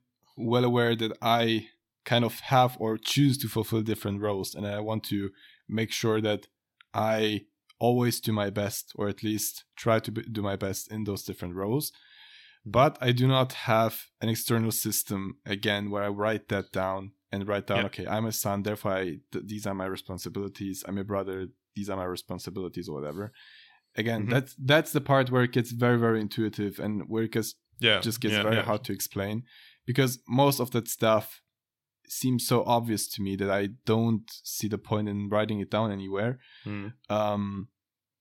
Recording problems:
none

